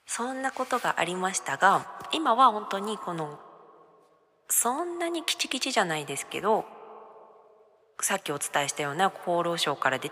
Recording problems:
thin; somewhat; fading below 750 Hz
echo of what is said; faint; throughout; 150 ms later, 20 dB below the speech

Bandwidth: 15 kHz